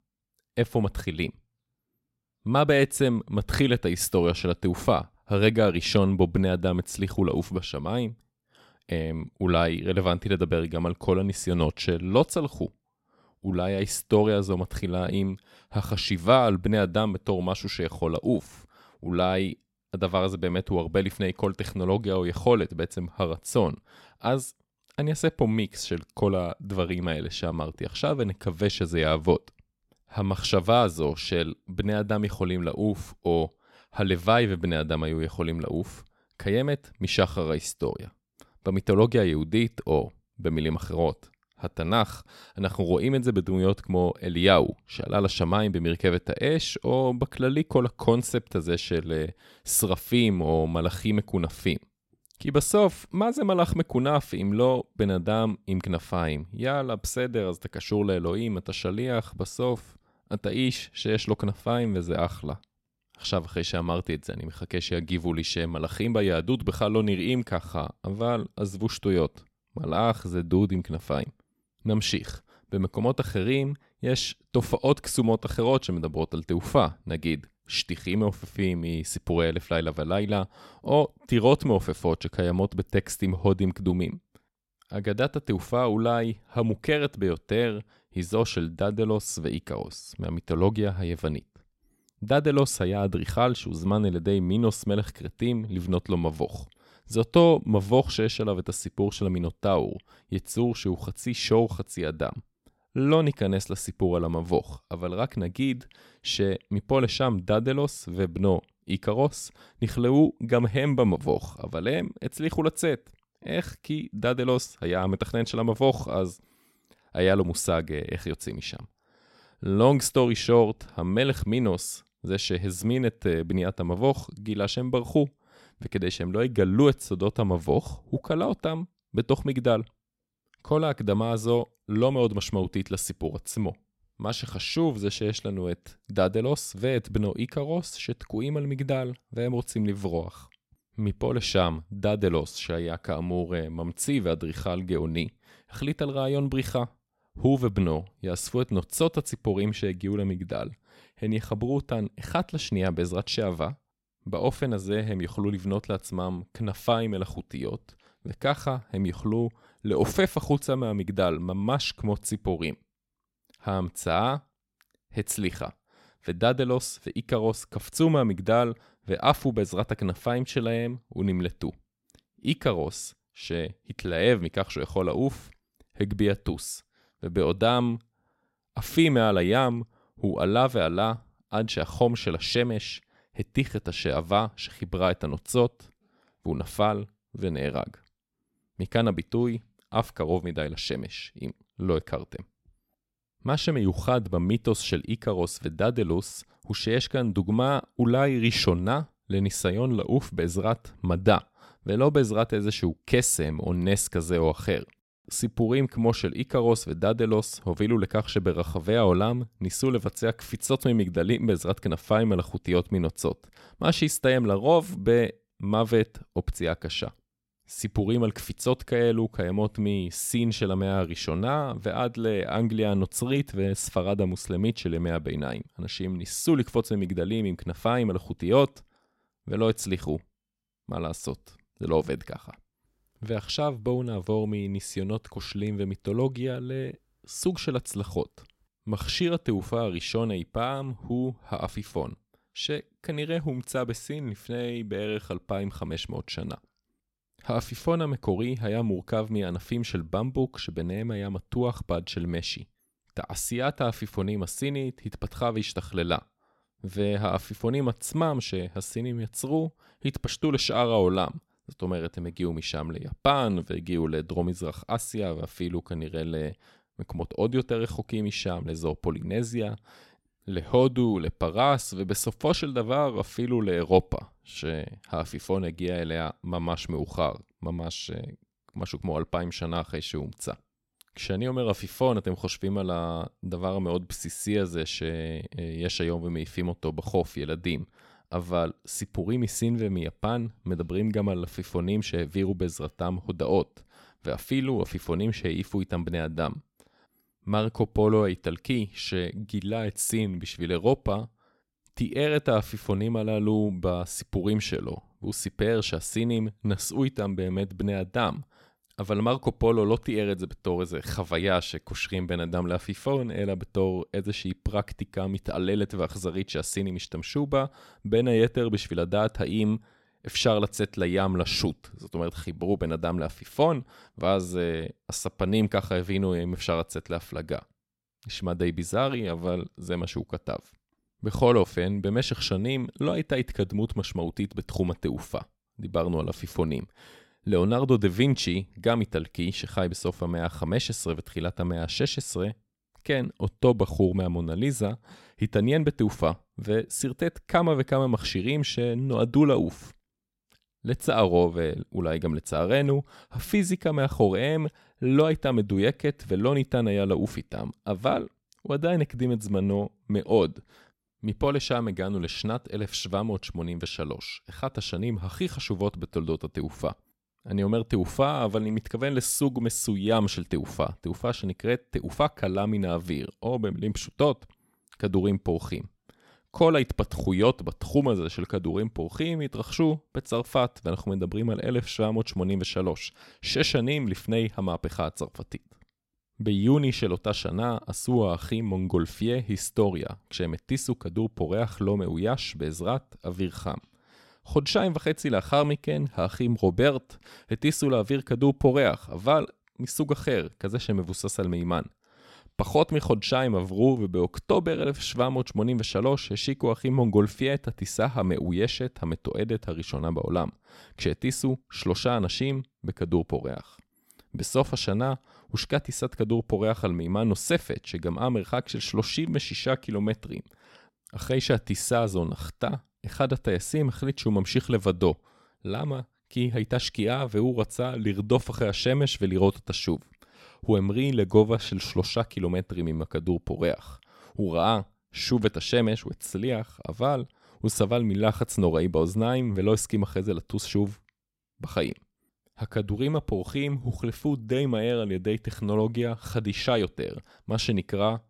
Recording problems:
none

